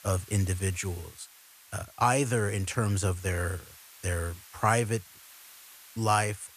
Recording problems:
hiss; faint; throughout; 20 dB below the speech

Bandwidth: 14.5 kHz